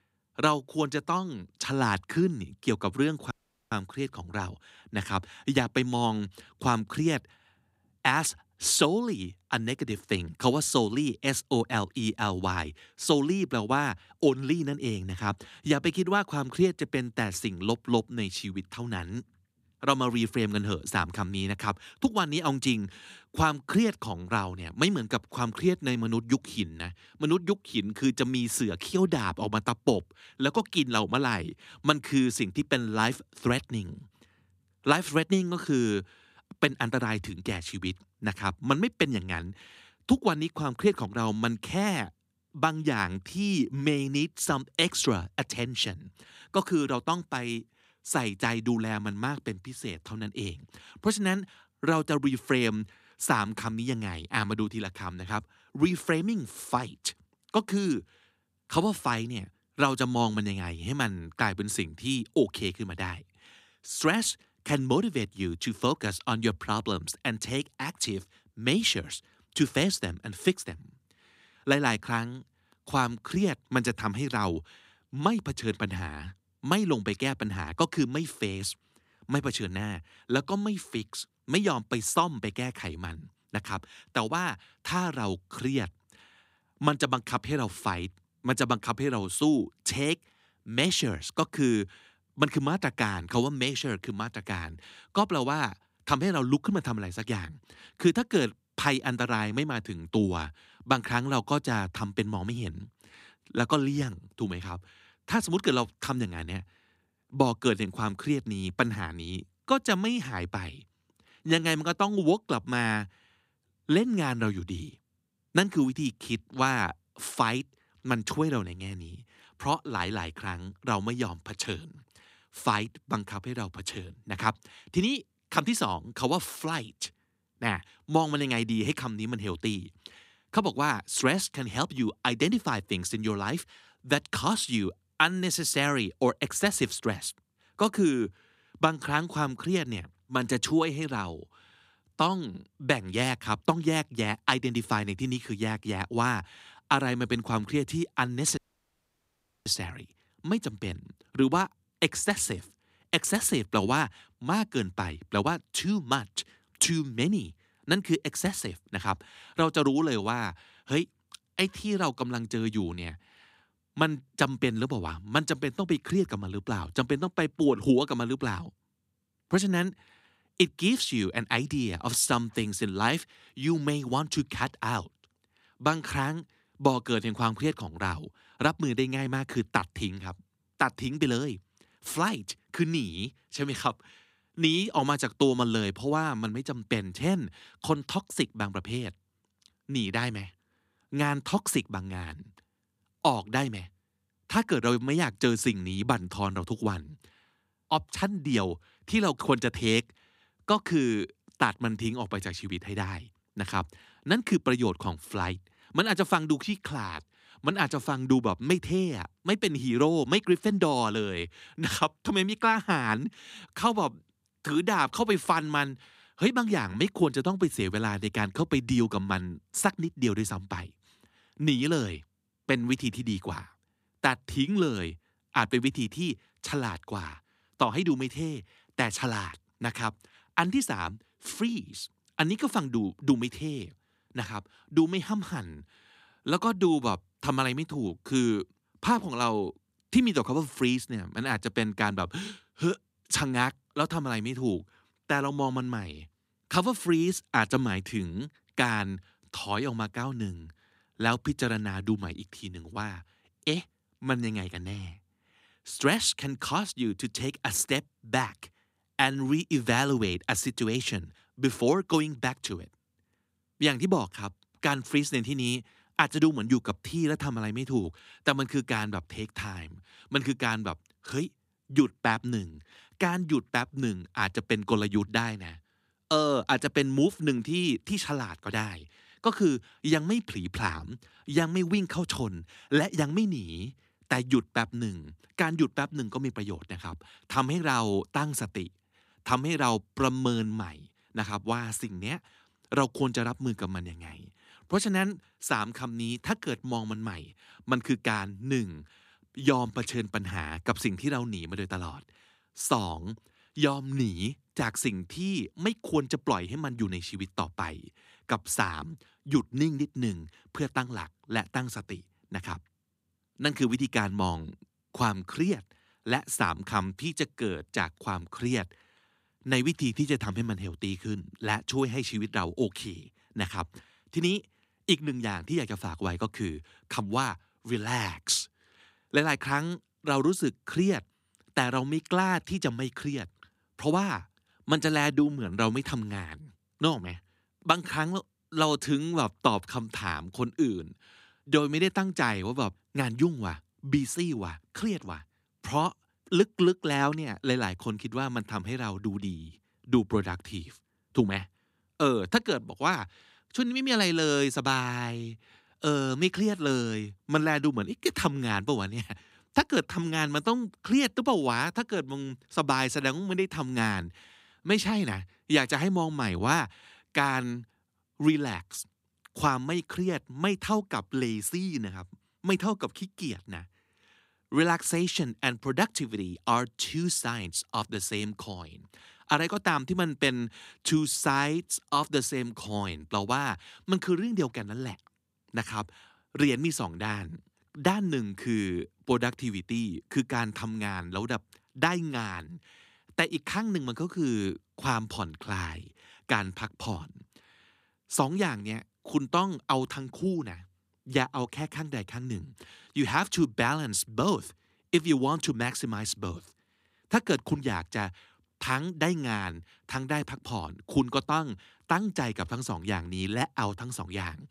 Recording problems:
audio cutting out; at 3.5 s and at 2:29 for 1 s

